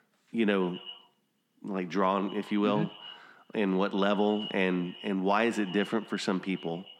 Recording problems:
echo of what is said; noticeable; throughout; 120 ms later, 15 dB below the speech

